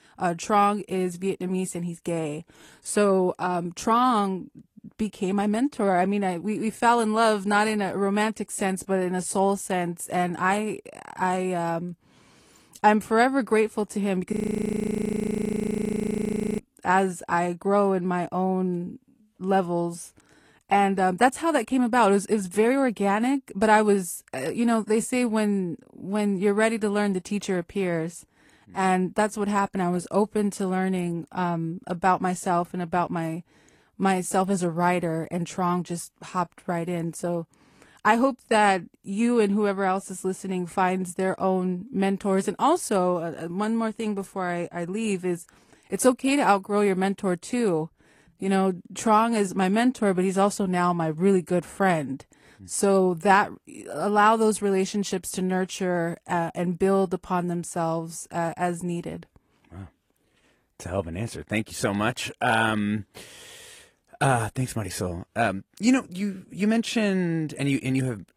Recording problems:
garbled, watery; slightly; nothing above 14.5 kHz
audio freezing; at 14 s for 2.5 s

